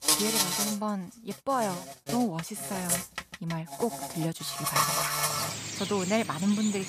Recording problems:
animal sounds; very loud; throughout; 2 dB above the speech

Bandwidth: 14.5 kHz